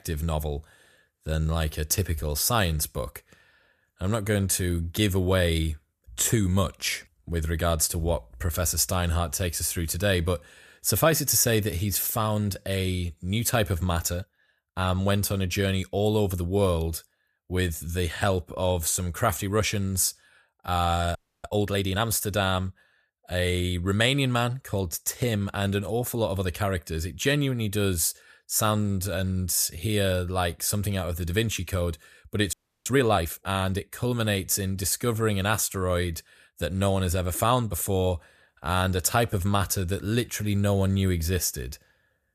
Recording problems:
audio freezing; at 21 s and at 33 s

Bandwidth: 14.5 kHz